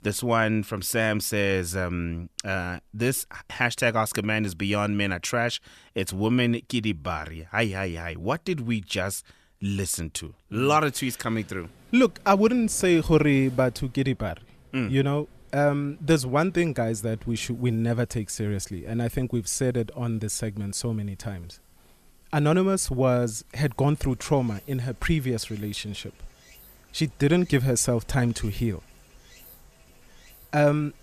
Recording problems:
rain or running water; faint; from 11 s on; 25 dB below the speech

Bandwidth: 14 kHz